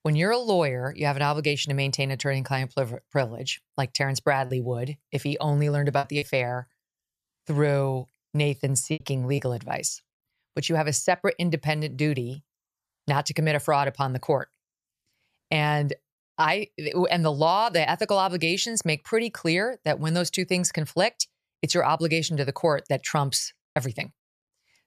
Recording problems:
choppy; occasionally; 2% of the speech affected

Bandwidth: 14.5 kHz